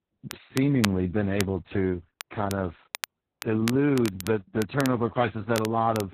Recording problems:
garbled, watery; badly; nothing above 4 kHz
crackle, like an old record; noticeable; 10 dB below the speech

